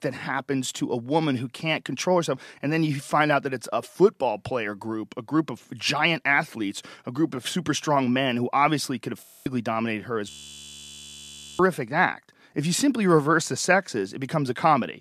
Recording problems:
audio freezing; at 9 s and at 10 s for 1.5 s

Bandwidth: 14.5 kHz